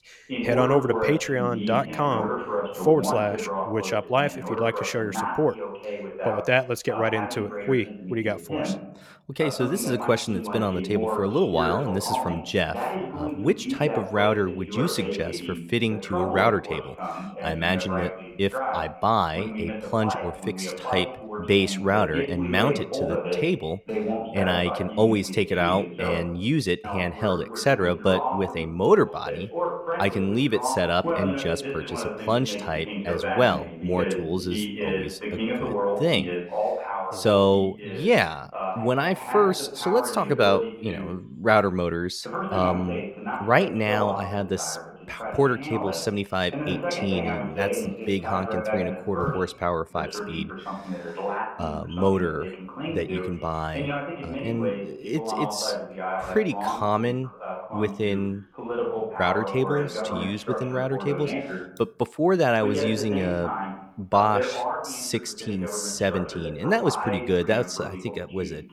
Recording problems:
voice in the background; loud; throughout; 6 dB below the speech

